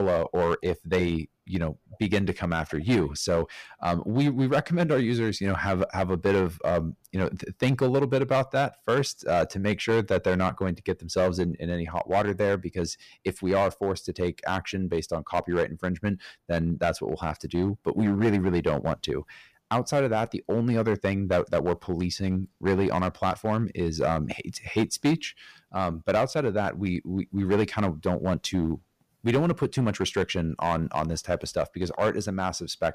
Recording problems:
distortion; slight; 5% of the sound clipped
abrupt cut into speech; at the start

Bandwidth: 15 kHz